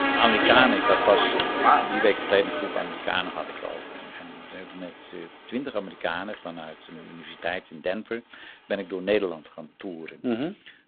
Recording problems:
phone-call audio; poor line
traffic noise; very loud; throughout; 3 dB above the speech

